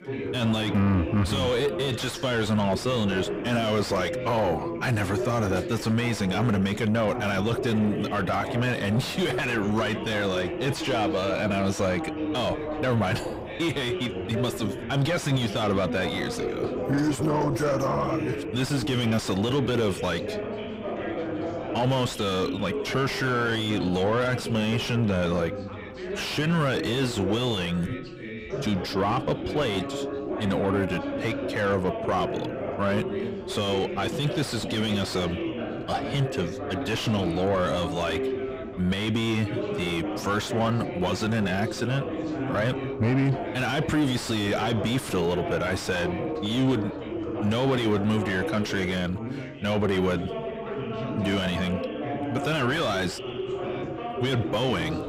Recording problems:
distortion; heavy; 6 dB below the speech
background chatter; loud; throughout; 4 voices, 6 dB below the speech

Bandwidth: 15.5 kHz